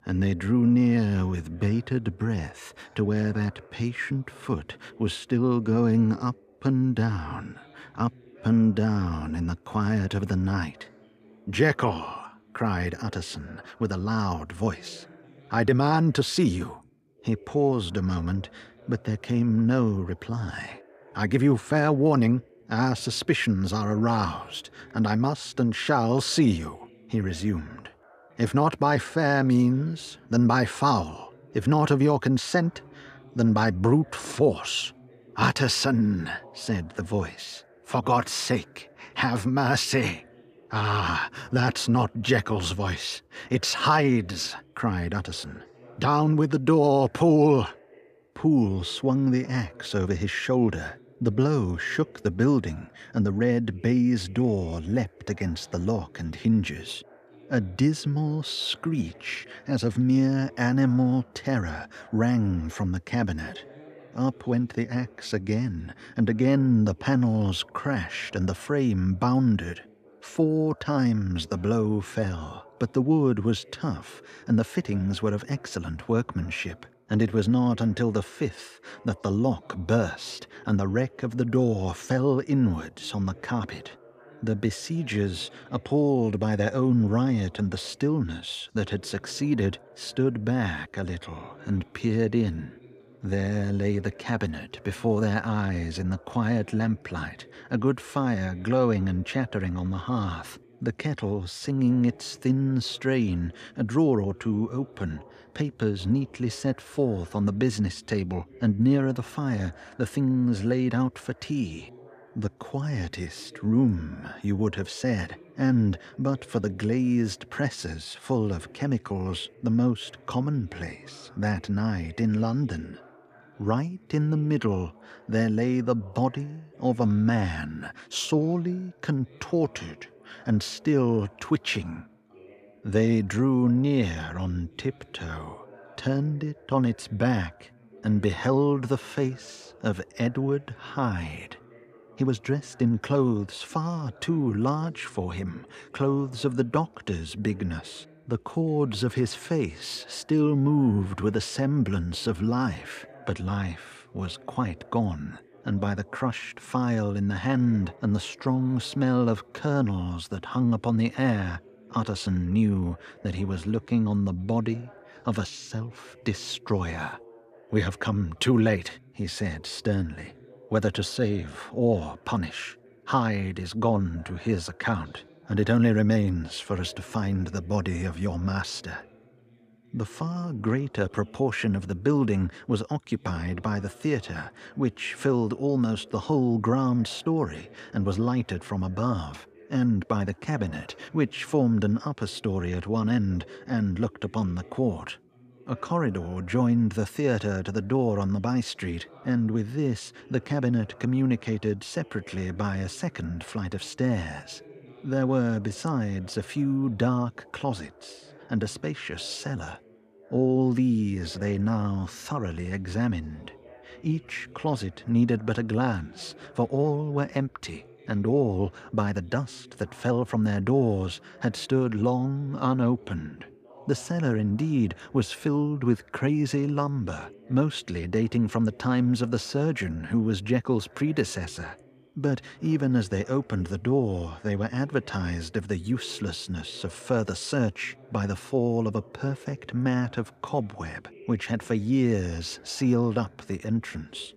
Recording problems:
background chatter; faint; throughout; 2 voices, 25 dB below the speech

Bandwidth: 14.5 kHz